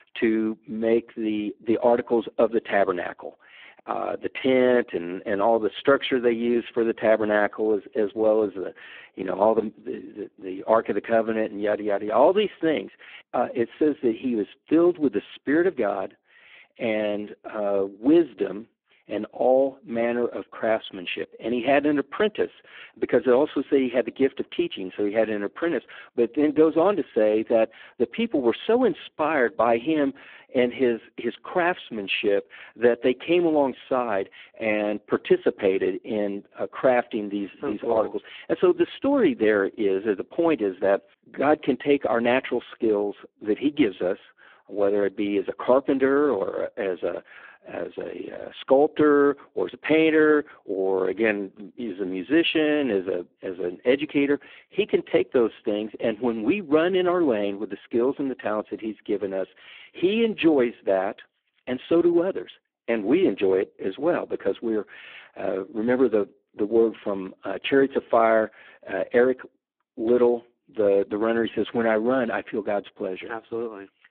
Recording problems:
phone-call audio; poor line

